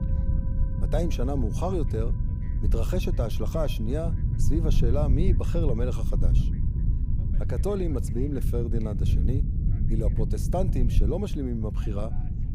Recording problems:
low rumble; loud; throughout; 8 dB below the speech
background music; faint; throughout; 25 dB below the speech
voice in the background; faint; throughout; 30 dB below the speech

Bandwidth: 15.5 kHz